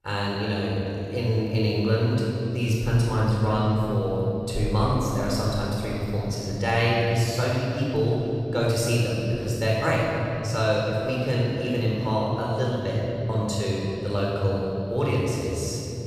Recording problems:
room echo; strong; dies away in 3 s
off-mic speech; far

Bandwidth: 14.5 kHz